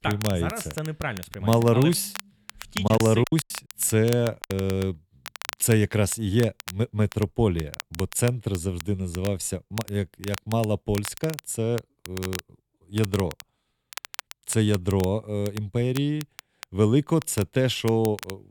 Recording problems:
crackle, like an old record; noticeable; 15 dB below the speech
choppy; very; from 3 to 4.5 s; 15% of the speech affected

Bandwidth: 18.5 kHz